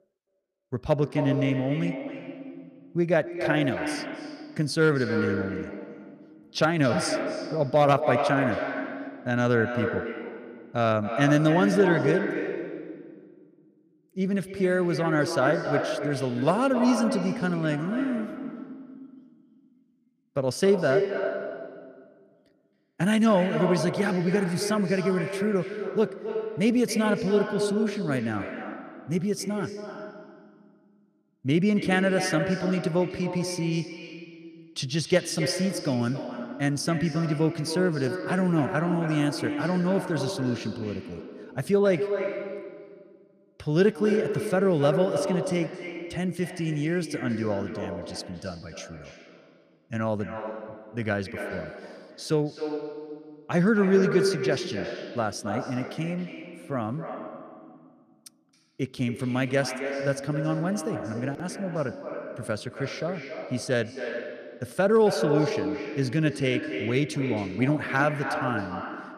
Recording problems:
echo of what is said; strong; throughout; 270 ms later, 6 dB below the speech

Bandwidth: 15 kHz